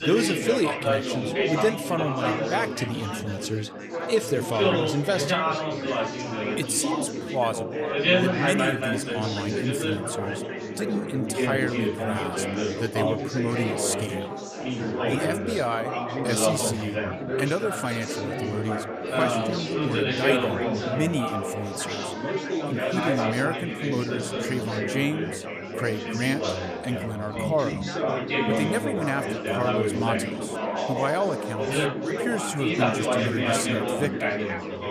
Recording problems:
chatter from many people; very loud; throughout; 2 dB above the speech

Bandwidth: 14.5 kHz